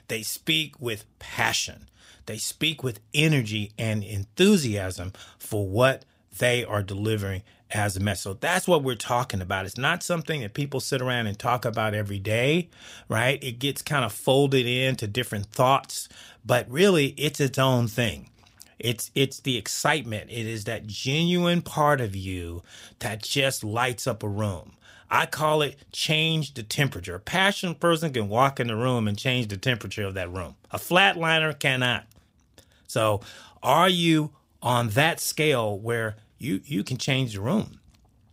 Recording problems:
none

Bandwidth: 15.5 kHz